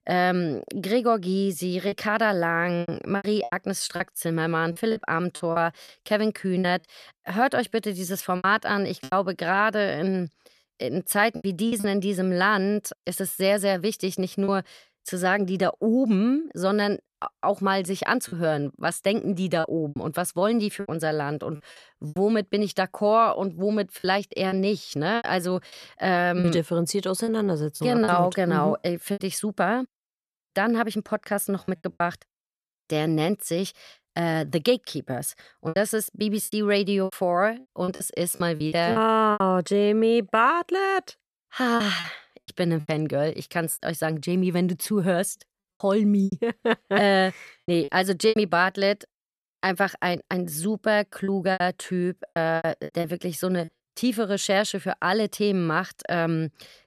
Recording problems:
choppy; very; 7% of the speech affected

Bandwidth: 13.5 kHz